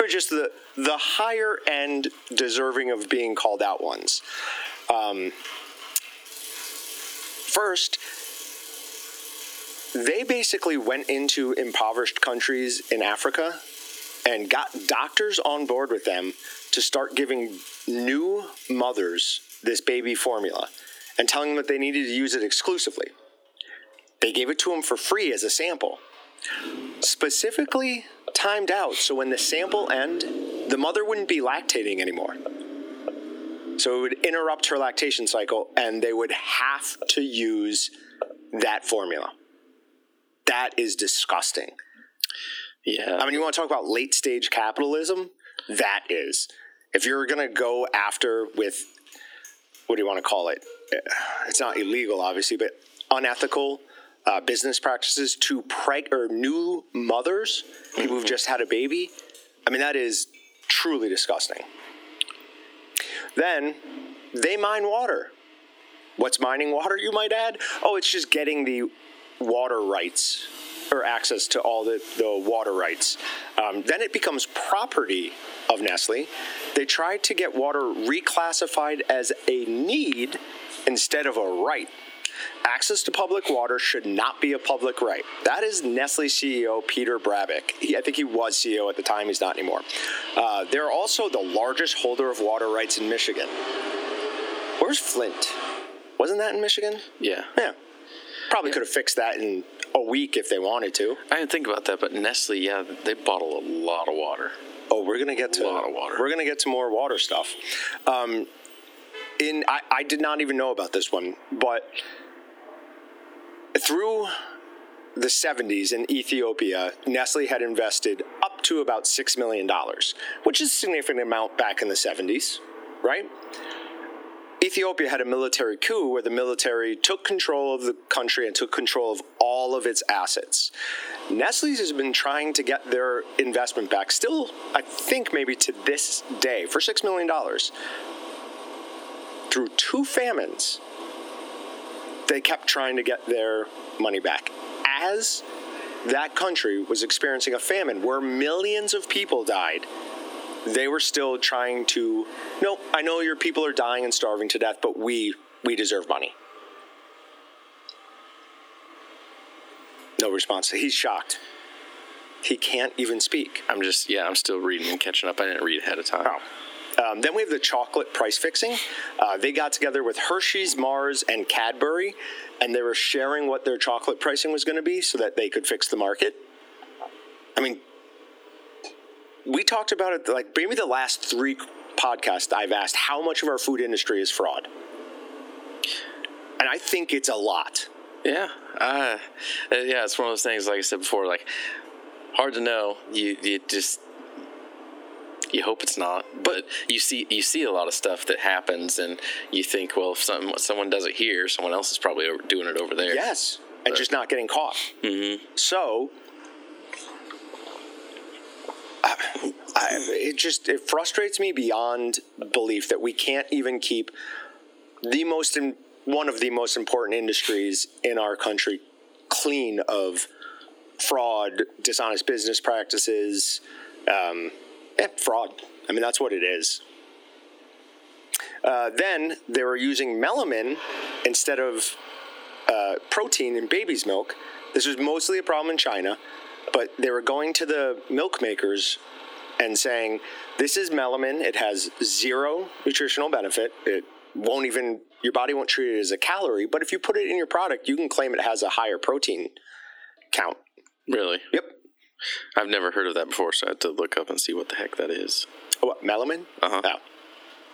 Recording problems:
thin; somewhat; fading below 300 Hz
squashed, flat; somewhat, background pumping
traffic noise; noticeable; throughout; 15 dB below the speech
abrupt cut into speech; at the start

